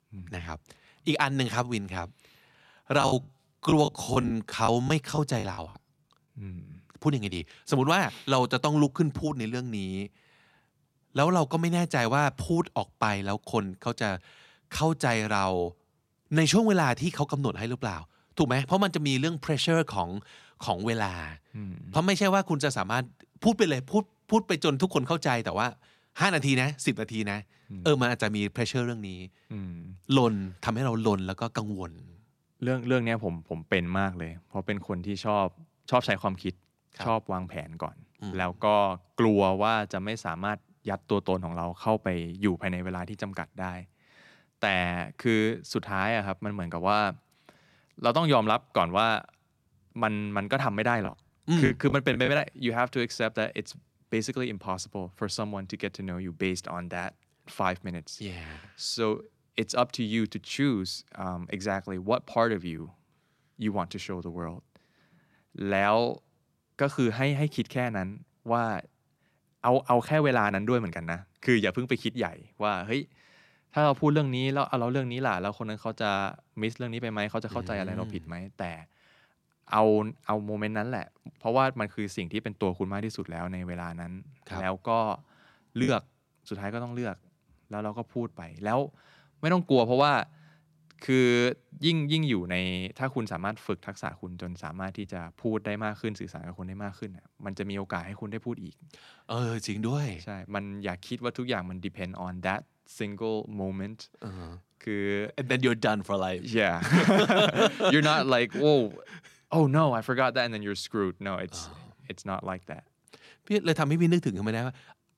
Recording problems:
choppy; very; from 3 to 5.5 s and from 51 to 52 s; 14% of the speech affected

